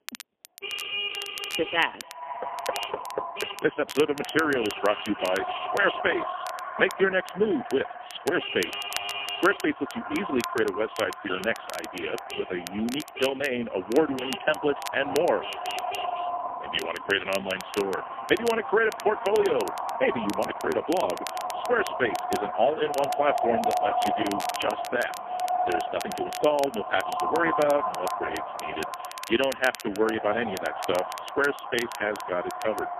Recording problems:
phone-call audio; poor line; nothing above 3.5 kHz
echo of what is said; strong; throughout; 100 ms later, 6 dB below the speech
traffic noise; loud; throughout; 8 dB below the speech
crackle, like an old record; noticeable; 15 dB below the speech
door banging; faint; at 2.5 s; peak 10 dB below the speech

